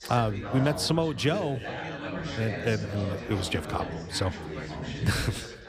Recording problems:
background chatter; loud; throughout; 4 voices, 7 dB below the speech

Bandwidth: 15 kHz